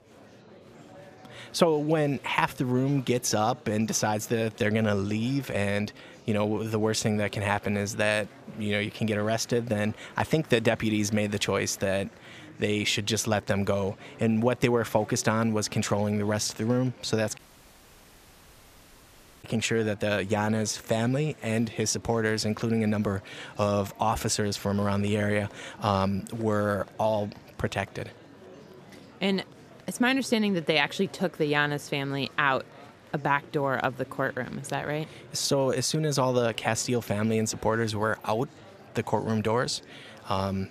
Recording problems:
murmuring crowd; faint; throughout; 20 dB below the speech
audio cutting out; at 17 s for 2 s

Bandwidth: 14.5 kHz